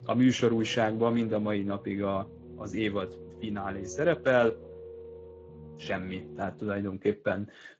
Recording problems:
garbled, watery; slightly
background music; noticeable; throughout; 15 dB below the speech

